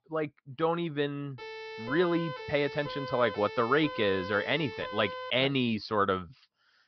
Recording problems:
high frequencies cut off; noticeable; nothing above 5.5 kHz
siren; noticeable; from 1.5 to 5.5 s; peak 8 dB below the speech

